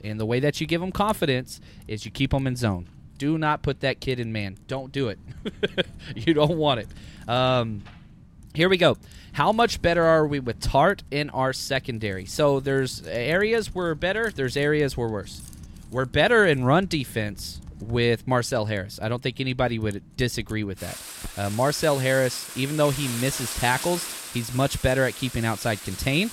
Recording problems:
household noises; noticeable; throughout; 15 dB below the speech

